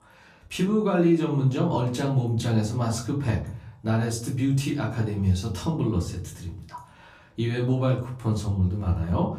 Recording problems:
off-mic speech; far
room echo; slight; dies away in 0.5 s

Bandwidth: 15 kHz